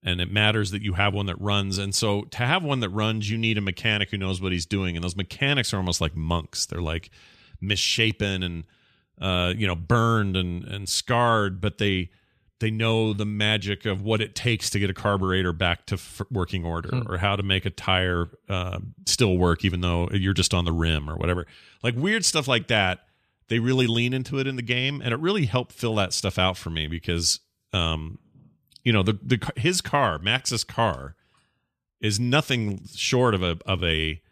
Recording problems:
none

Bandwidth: 14.5 kHz